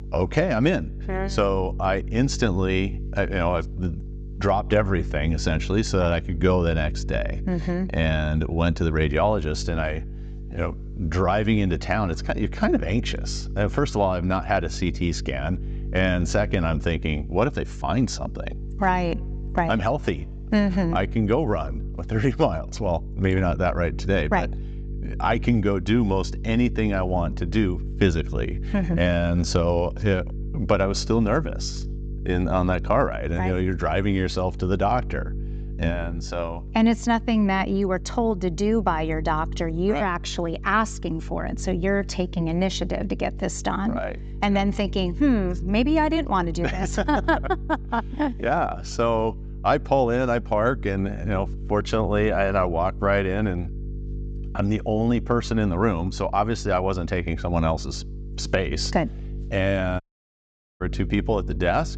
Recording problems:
high frequencies cut off; noticeable; nothing above 8 kHz
electrical hum; faint; throughout; 50 Hz, 20 dB below the speech
audio cutting out; at 1:00 for 1 s

